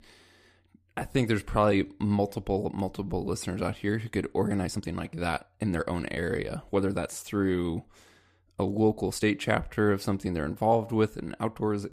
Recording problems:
uneven, jittery; strongly; from 1 to 11 s

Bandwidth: 14.5 kHz